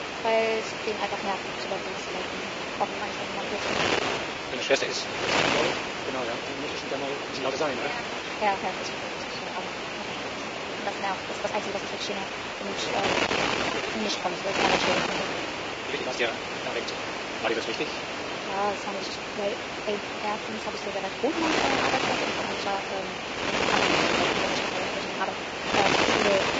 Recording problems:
garbled, watery; badly; nothing above 7.5 kHz
wrong speed, natural pitch; too fast; 1.6 times normal speed
thin; somewhat; fading below 400 Hz
wind noise on the microphone; heavy; 4 dB above the speech
uneven, jittery; strongly; from 1.5 to 25 s

